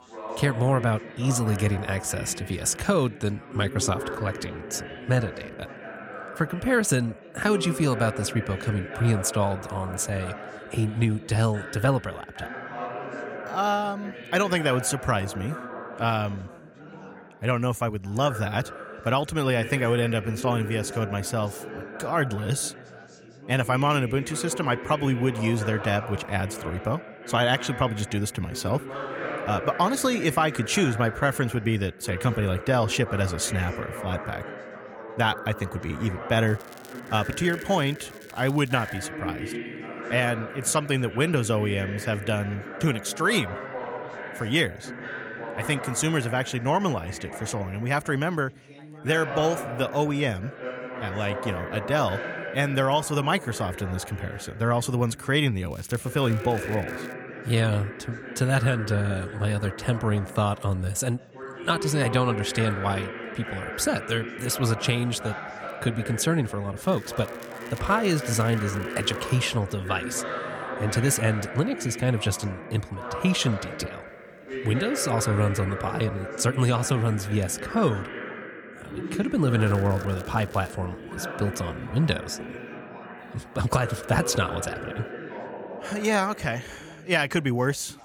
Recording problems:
background chatter; loud; throughout; 4 voices, 10 dB below the speech
crackling; faint; 4 times, first at 36 s; 25 dB below the speech

